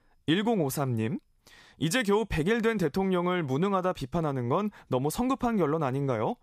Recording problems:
none

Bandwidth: 14.5 kHz